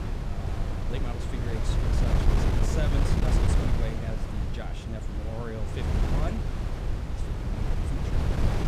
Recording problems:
wind noise on the microphone; heavy; 4 dB above the speech

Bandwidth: 14.5 kHz